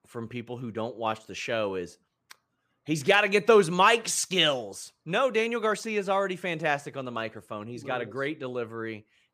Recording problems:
none

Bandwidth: 15 kHz